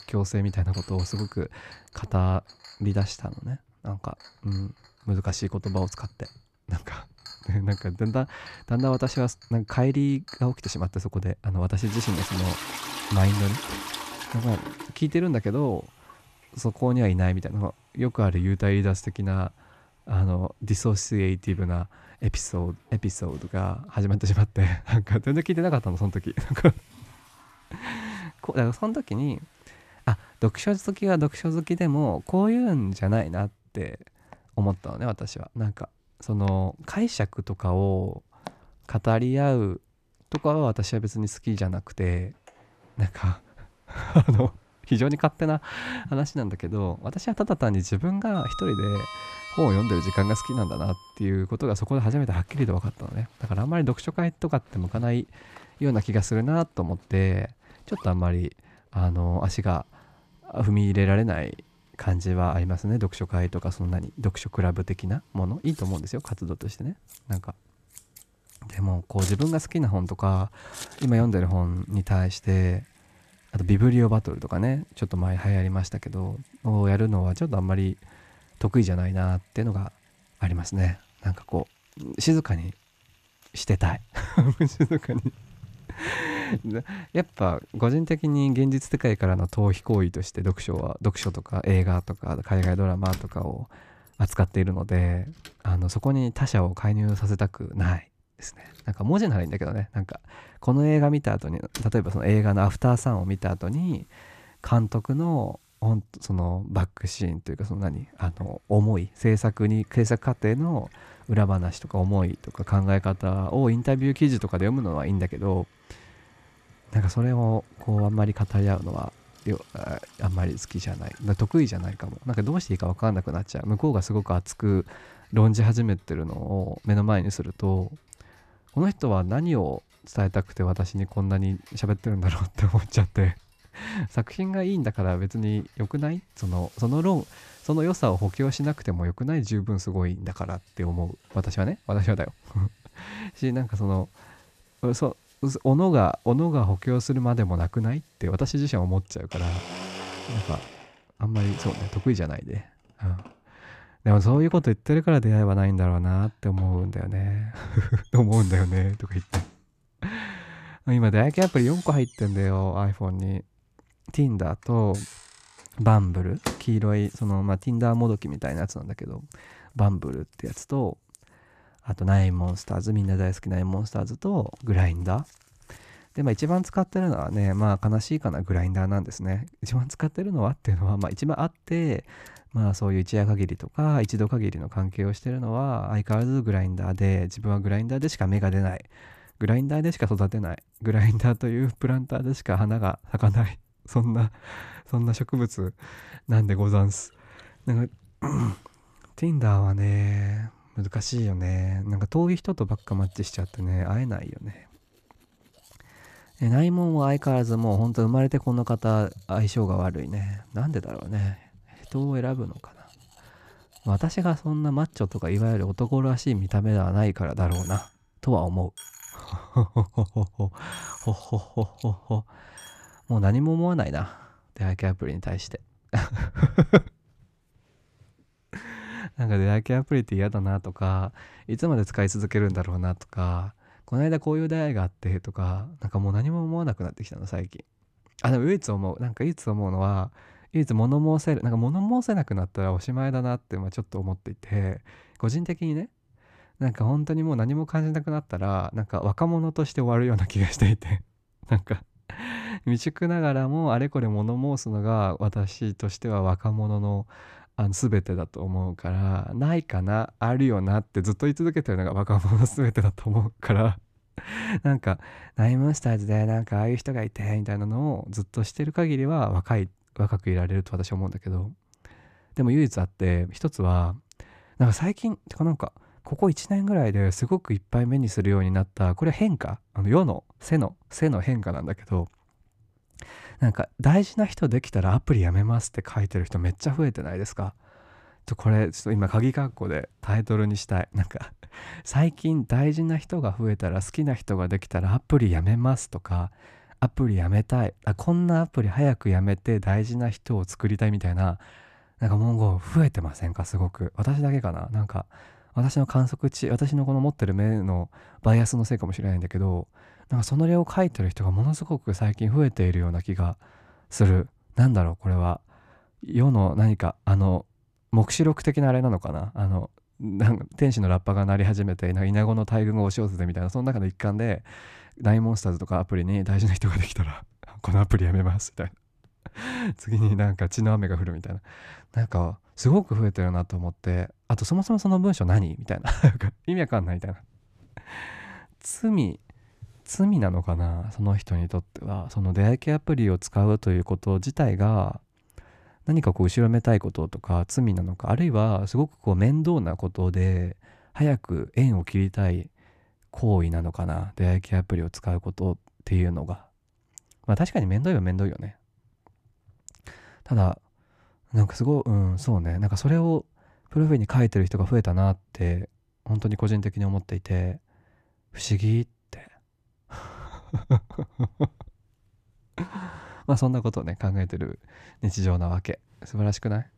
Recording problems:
household noises; noticeable; until 3:43; 15 dB below the speech

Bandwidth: 14.5 kHz